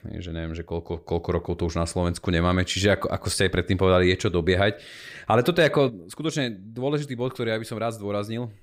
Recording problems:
none

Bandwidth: 15.5 kHz